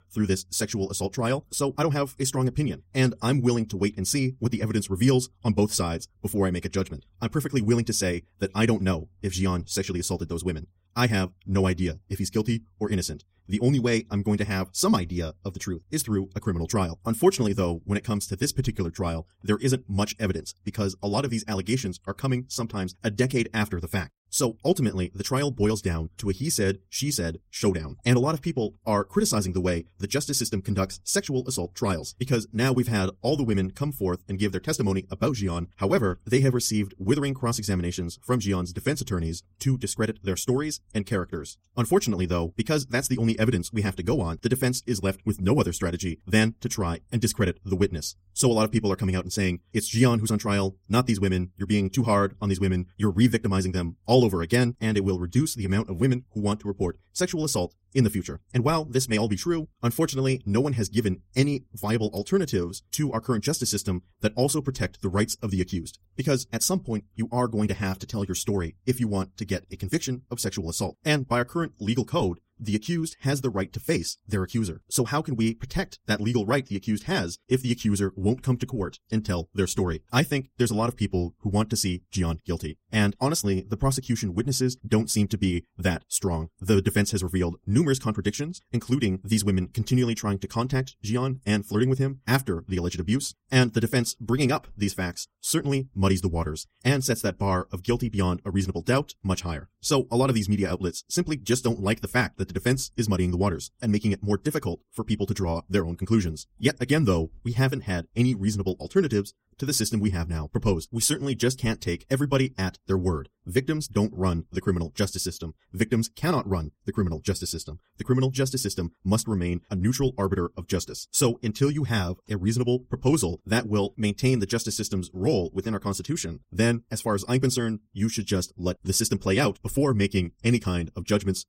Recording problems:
wrong speed, natural pitch; too fast; 1.6 times normal speed

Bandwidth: 16 kHz